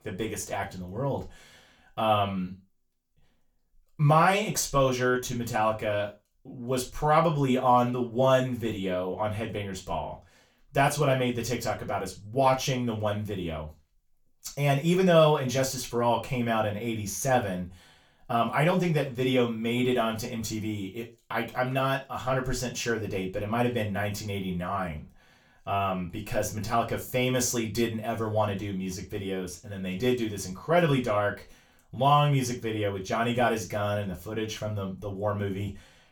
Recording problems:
off-mic speech; far
room echo; slight; dies away in 0.3 s

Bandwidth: 19 kHz